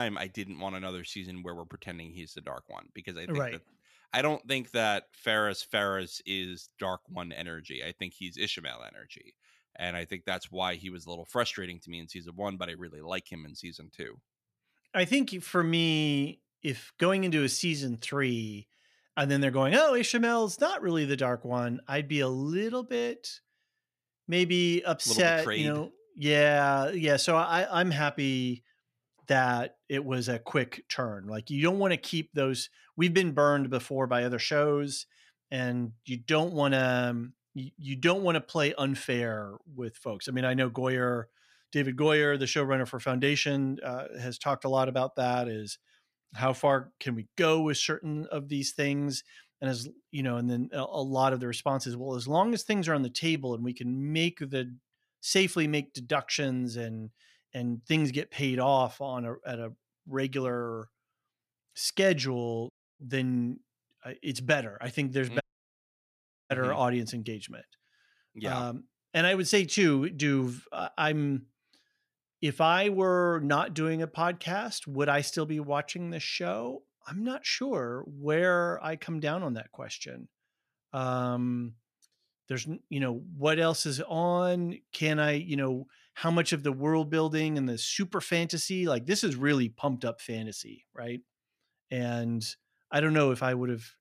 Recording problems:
abrupt cut into speech; at the start
audio cutting out; at 1:03 and at 1:05 for 1 s

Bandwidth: 14.5 kHz